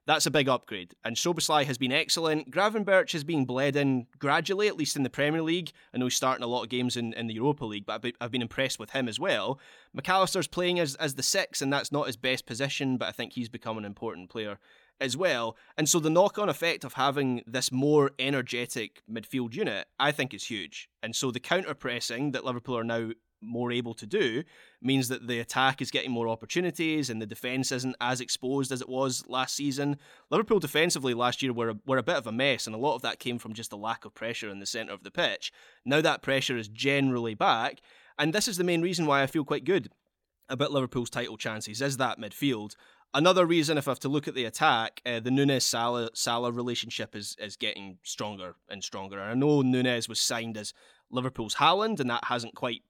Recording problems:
none

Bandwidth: 18 kHz